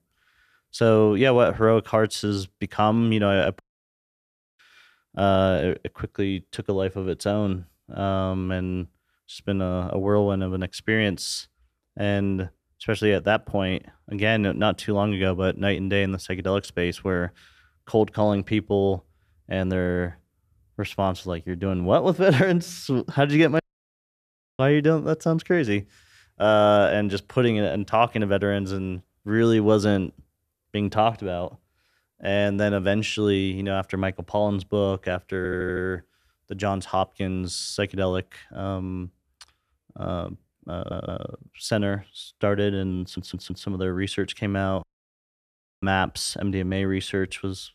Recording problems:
audio stuttering; at 35 s, at 41 s and at 43 s

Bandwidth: 14.5 kHz